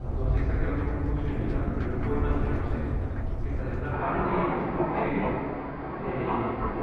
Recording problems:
room echo; strong; dies away in 2.4 s
off-mic speech; far
muffled; very; fading above 2 kHz
rain or running water; very loud; throughout; 2 dB above the speech

